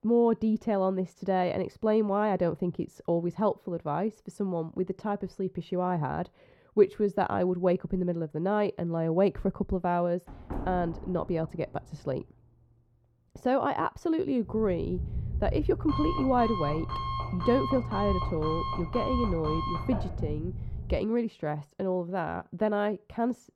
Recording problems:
muffled; very; fading above 1.5 kHz
door banging; noticeable; from 10 to 12 s; peak 8 dB below the speech
alarm; noticeable; from 14 to 21 s; peak 2 dB below the speech

